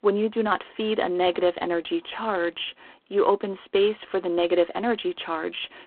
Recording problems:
phone-call audio; poor line

